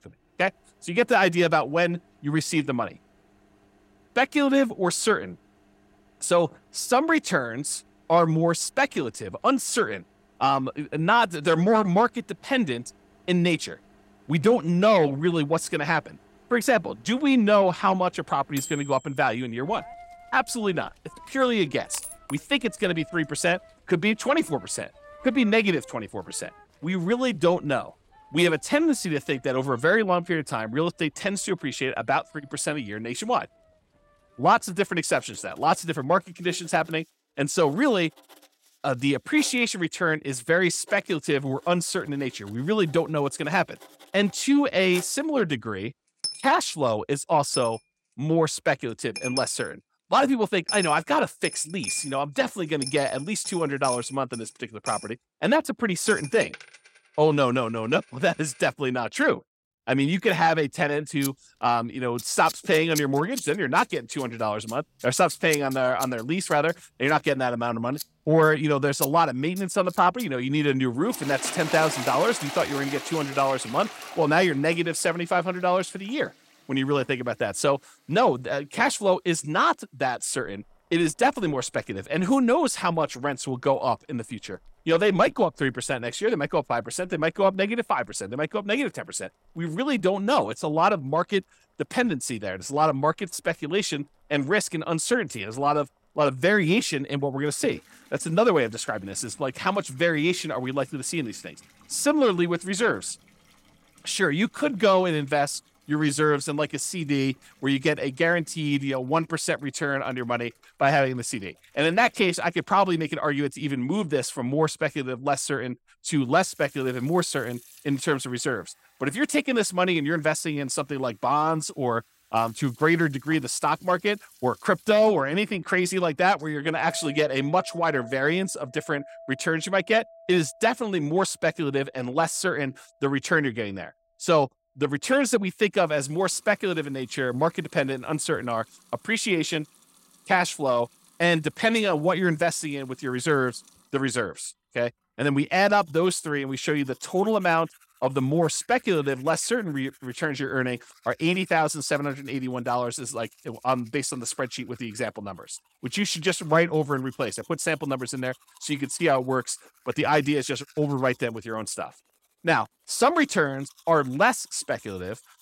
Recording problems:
household noises; noticeable; throughout; 15 dB below the speech

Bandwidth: 16 kHz